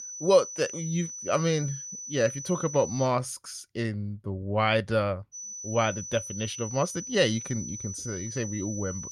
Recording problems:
high-pitched whine; loud; until 3 s and from 5.5 s on; 6 kHz, 8 dB below the speech

